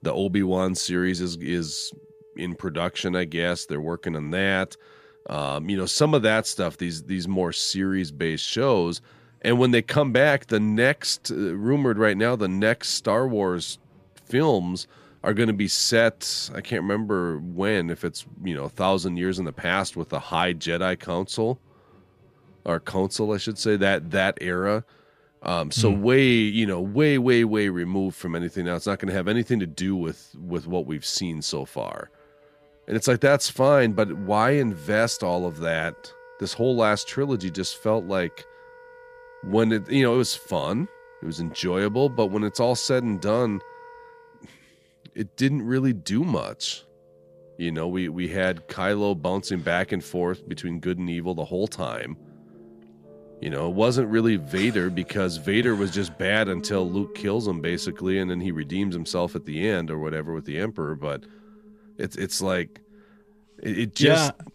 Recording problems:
background music; faint; throughout; 25 dB below the speech

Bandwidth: 14.5 kHz